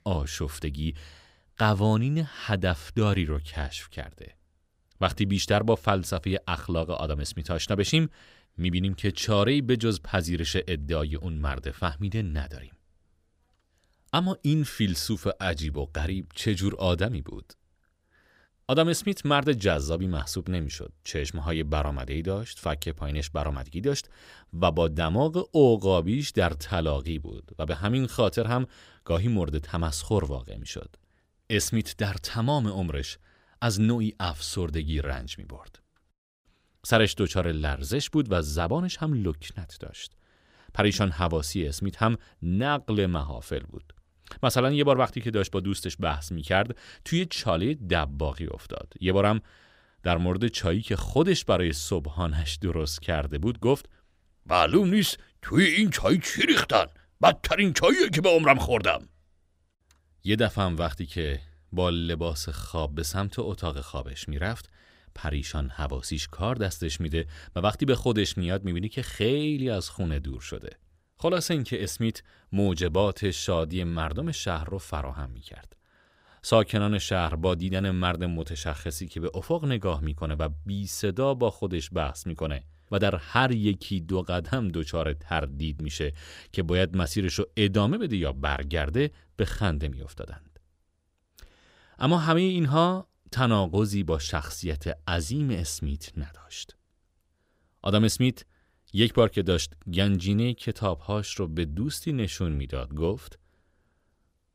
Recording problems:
none

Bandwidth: 15.5 kHz